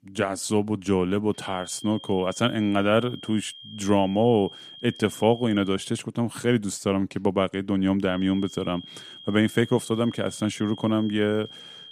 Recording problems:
high-pitched whine; noticeable; from 1.5 to 5.5 s and from 8 s on; 3 kHz, 15 dB below the speech

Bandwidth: 14.5 kHz